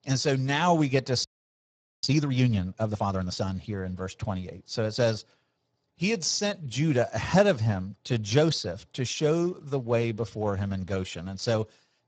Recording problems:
garbled, watery; badly
audio freezing; at 1 s for 1 s

